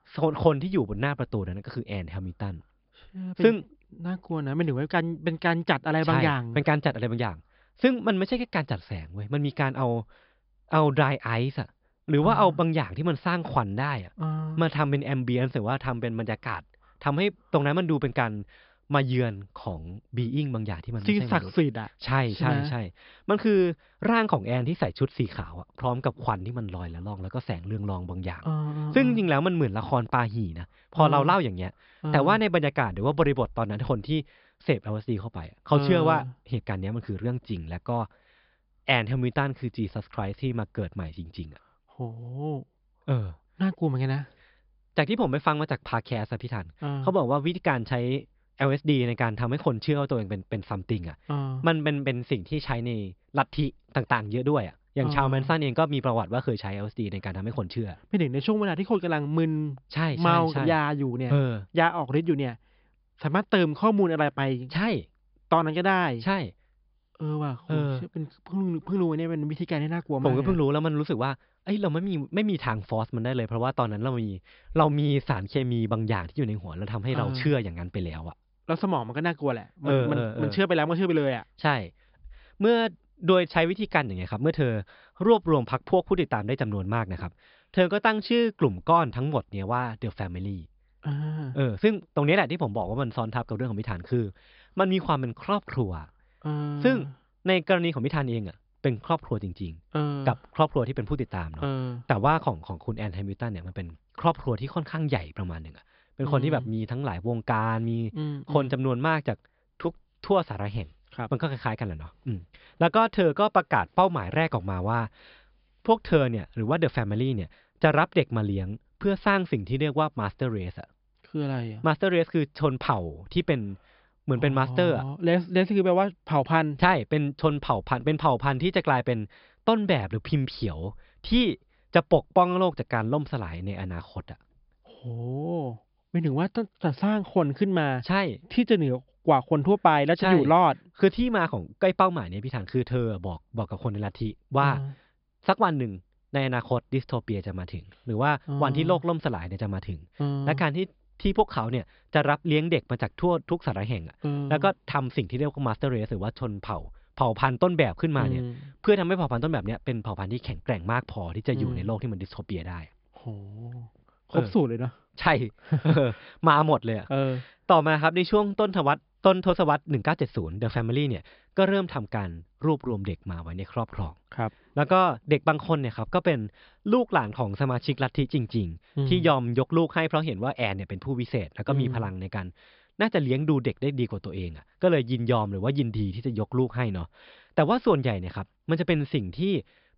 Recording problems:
high frequencies cut off; noticeable; nothing above 5 kHz

